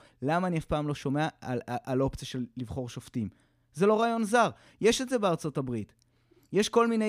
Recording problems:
abrupt cut into speech; at the end

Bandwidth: 15 kHz